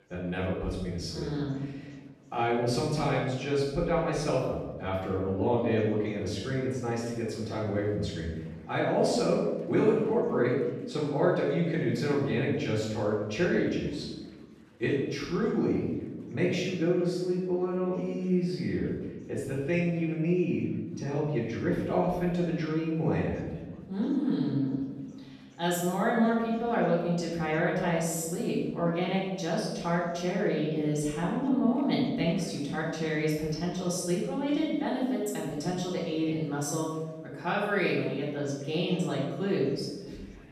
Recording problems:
off-mic speech; far
room echo; noticeable; dies away in 1.1 s
chatter from many people; faint; throughout; 30 dB below the speech

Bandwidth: 14 kHz